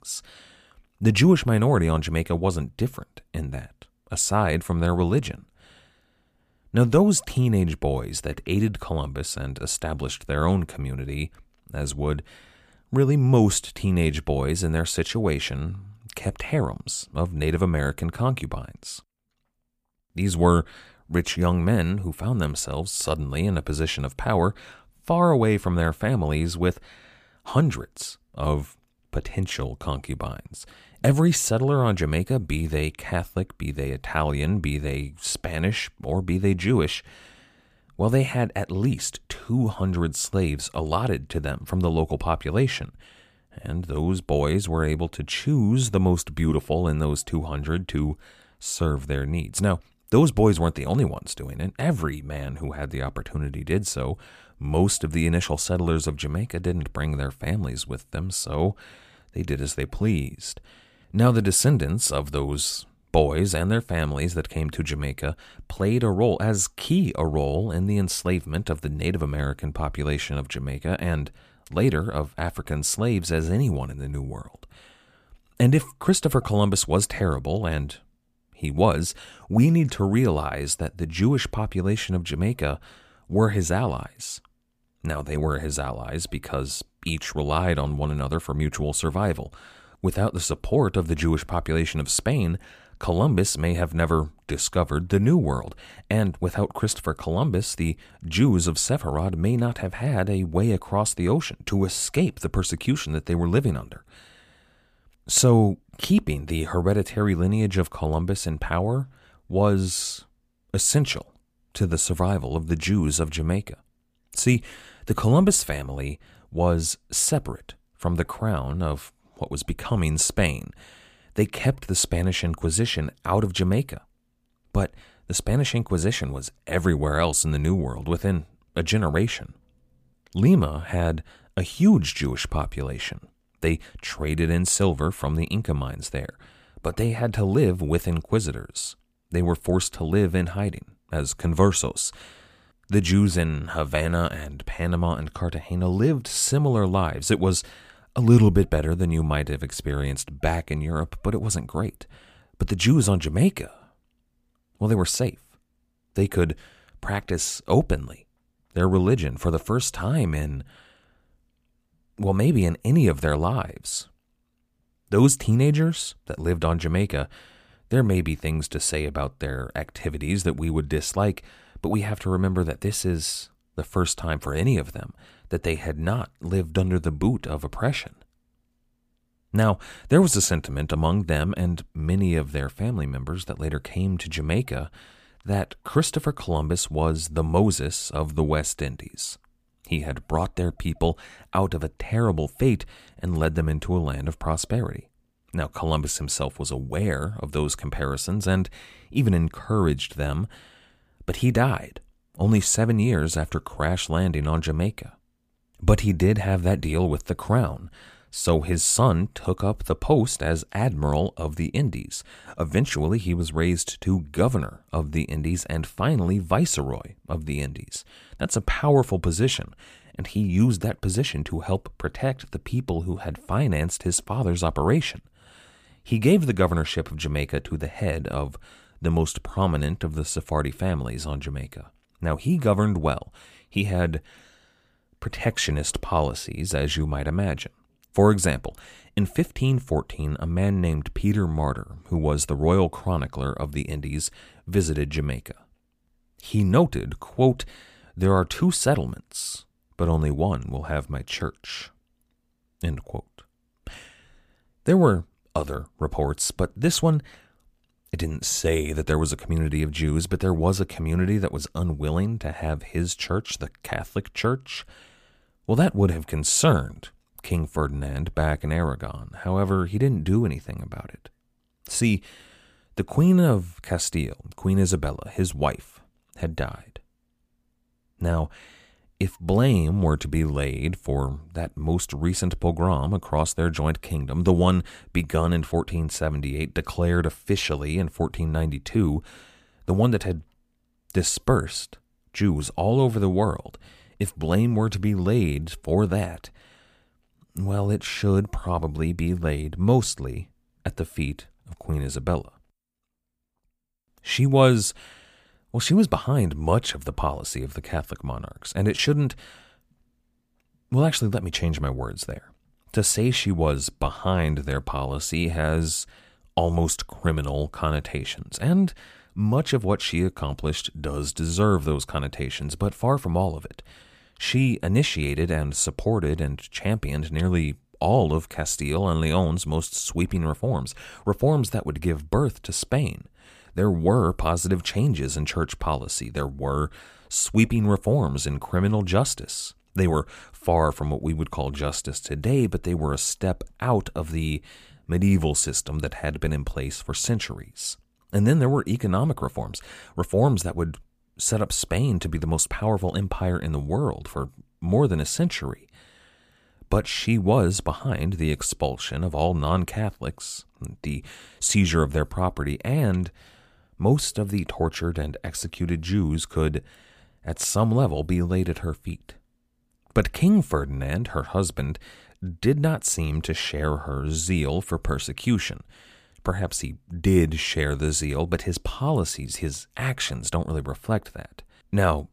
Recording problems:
none

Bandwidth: 15 kHz